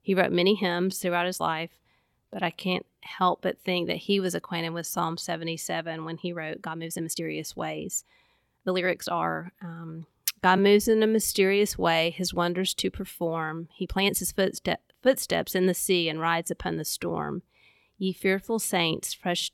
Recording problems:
uneven, jittery; strongly; from 0.5 to 14 s

